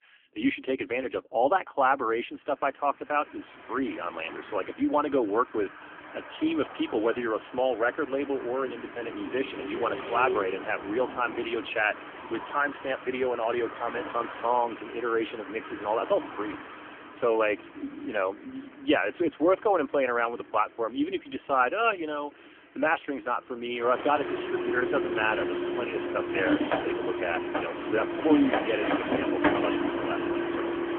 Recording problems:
phone-call audio; poor line; nothing above 3 kHz
traffic noise; loud; throughout; 4 dB below the speech

